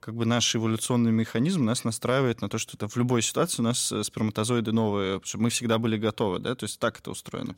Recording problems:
none

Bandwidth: 16 kHz